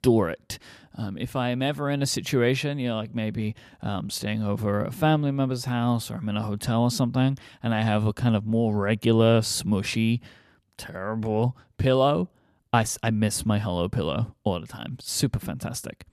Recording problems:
none

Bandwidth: 14.5 kHz